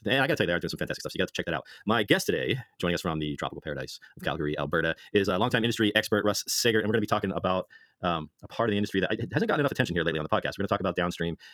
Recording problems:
wrong speed, natural pitch; too fast; 1.7 times normal speed

